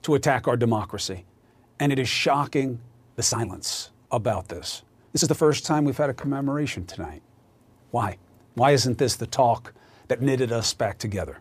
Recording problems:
uneven, jittery; strongly; from 1.5 to 11 s

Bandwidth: 15 kHz